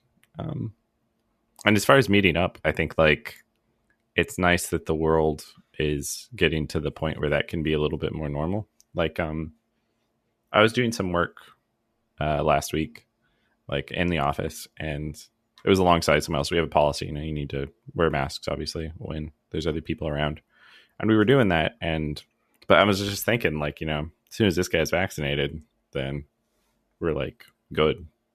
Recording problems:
none

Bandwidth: 14.5 kHz